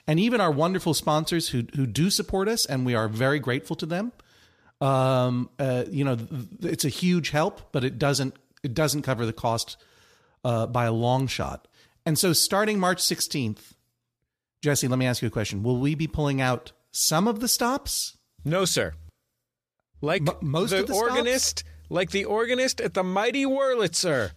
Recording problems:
none

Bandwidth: 14.5 kHz